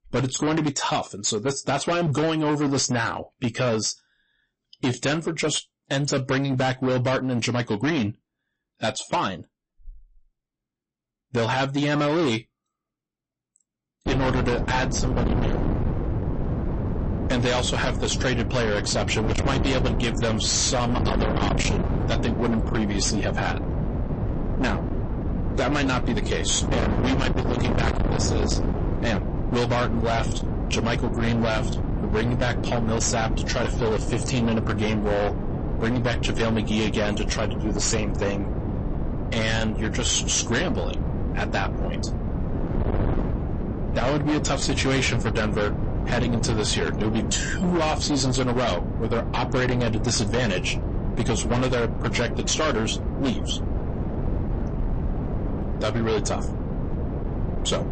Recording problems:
distortion; heavy; 27% of the sound clipped
garbled, watery; slightly; nothing above 8 kHz
wind noise on the microphone; heavy; from 14 s on; 7 dB below the speech

